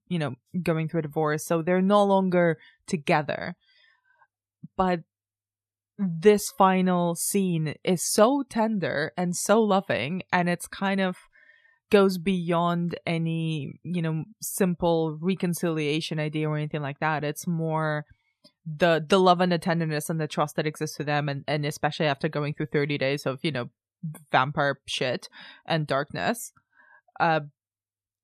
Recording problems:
none

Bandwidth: 14 kHz